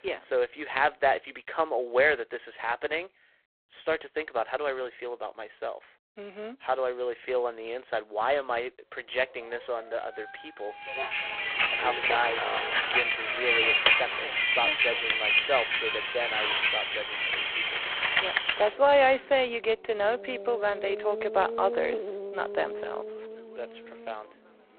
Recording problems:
phone-call audio; poor line; nothing above 4 kHz
traffic noise; very loud; from 11 s on; 3 dB above the speech
dog barking; faint; from 9 to 14 s; peak 10 dB below the speech

